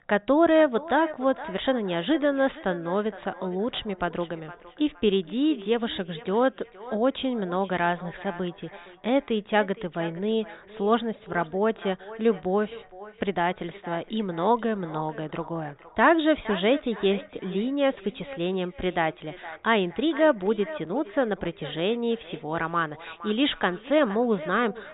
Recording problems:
high frequencies cut off; severe; nothing above 4 kHz
echo of what is said; noticeable; throughout; 460 ms later, 15 dB below the speech

